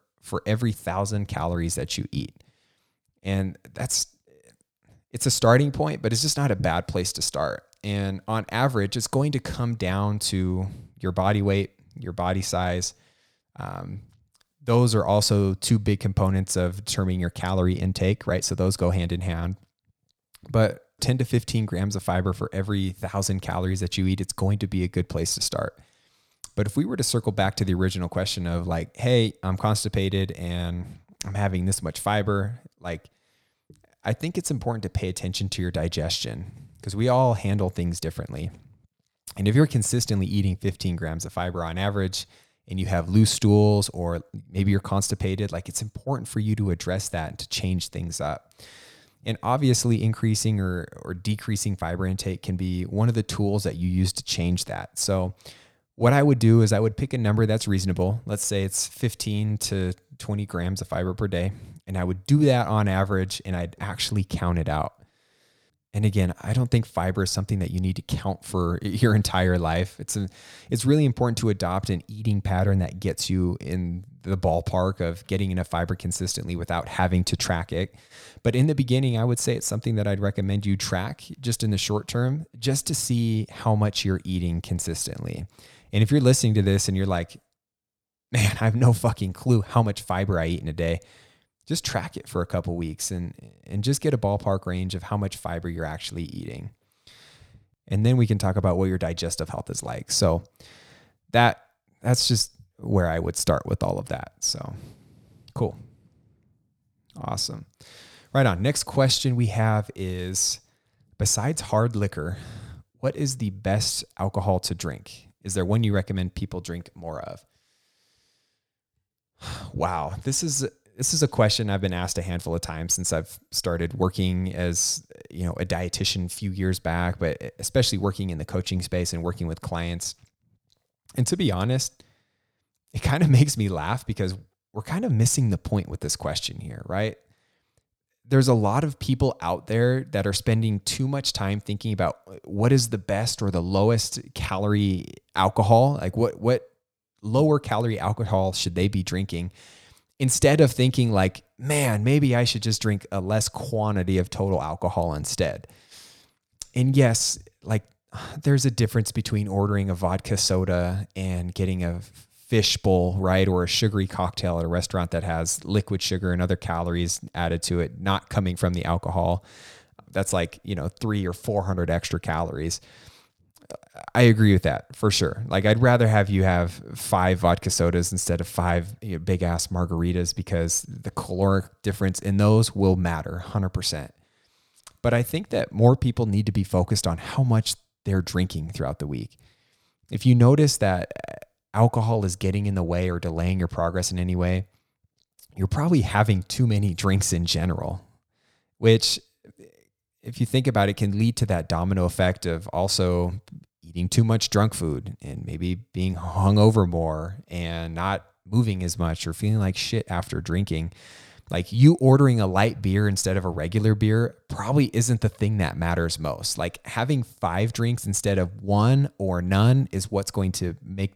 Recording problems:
none

